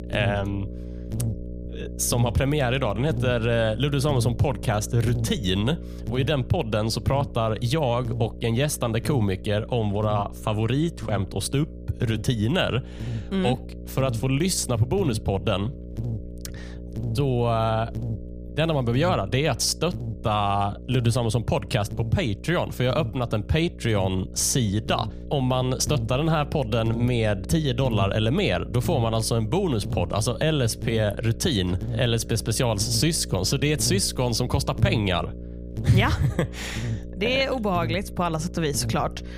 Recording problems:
electrical hum; noticeable; throughout; 60 Hz, 15 dB below the speech

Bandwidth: 15 kHz